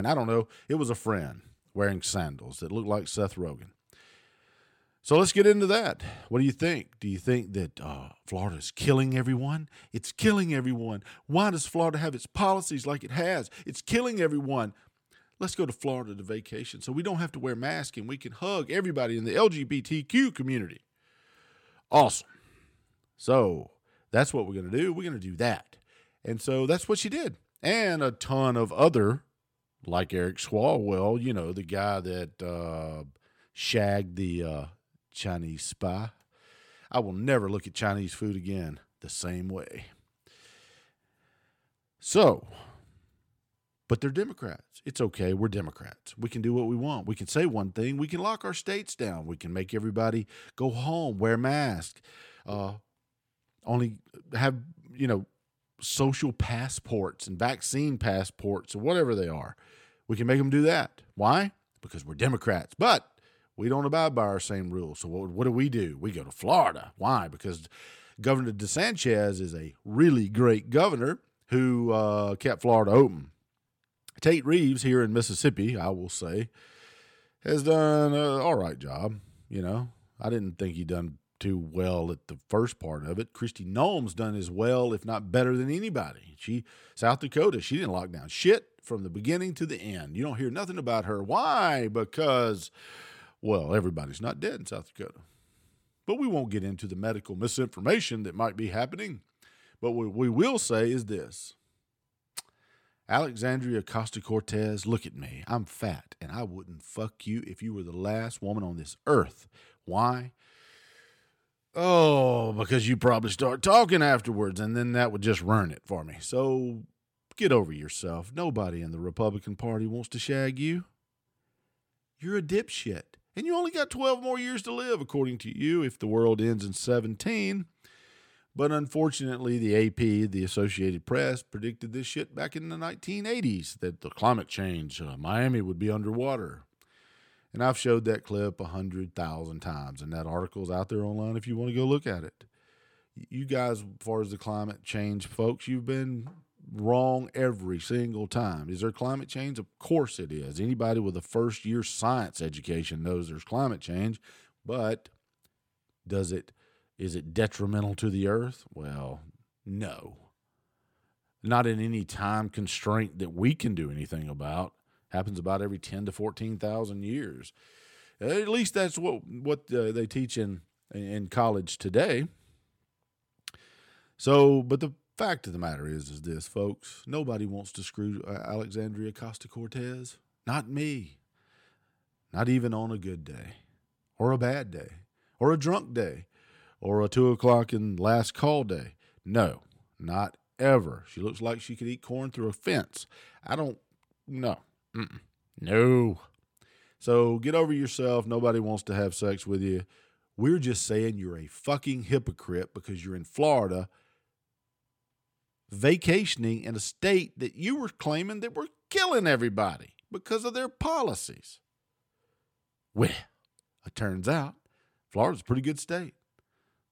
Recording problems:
abrupt cut into speech; at the start

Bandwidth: 17 kHz